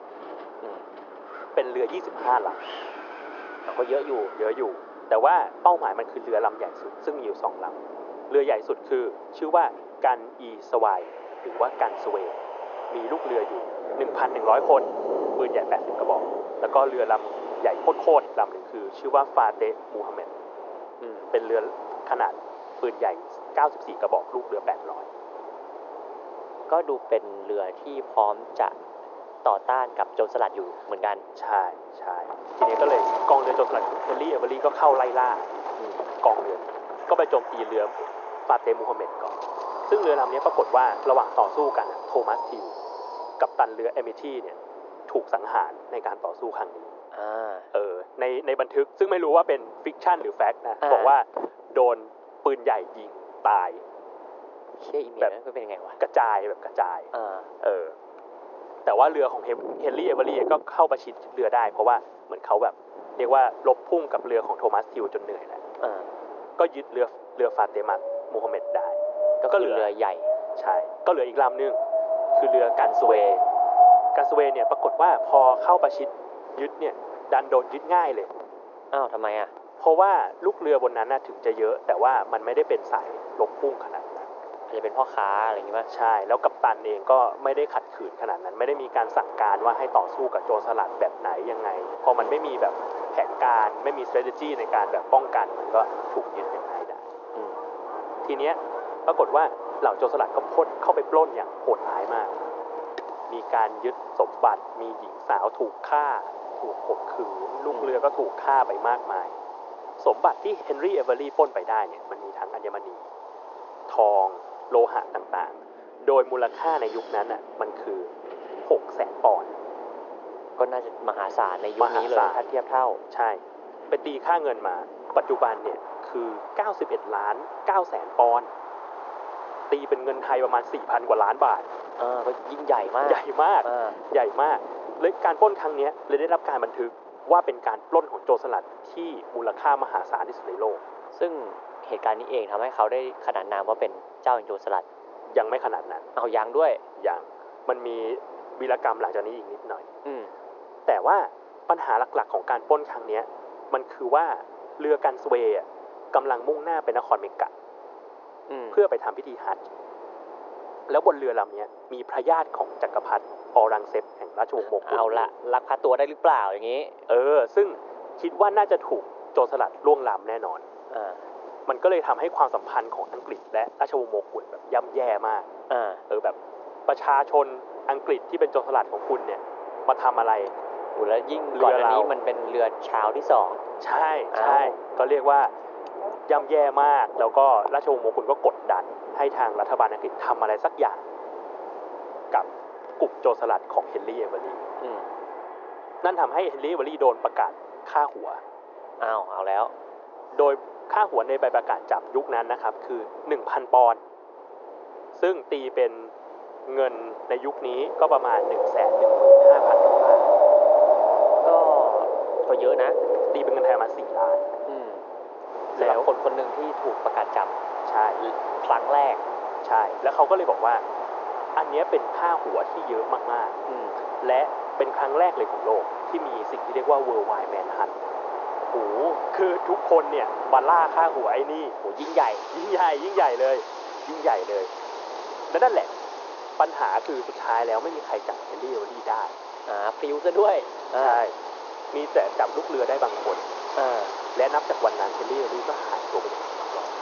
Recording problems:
thin; very; fading below 400 Hz
high frequencies cut off; noticeable; nothing above 6.5 kHz
muffled; very slightly; fading above 2 kHz
wind in the background; loud; throughout; 5 dB below the speech

